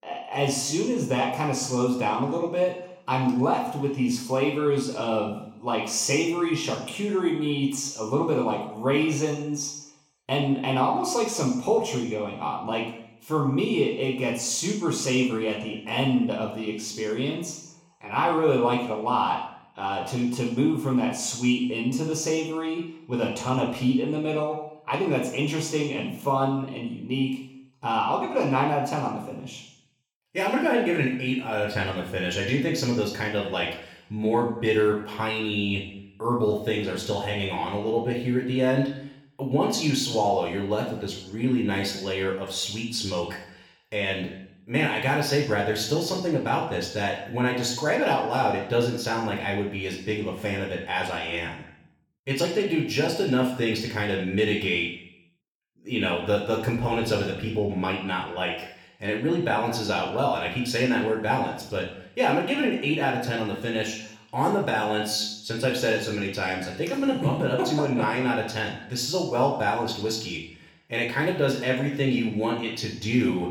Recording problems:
off-mic speech; far
room echo; noticeable; dies away in 0.7 s

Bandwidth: 17.5 kHz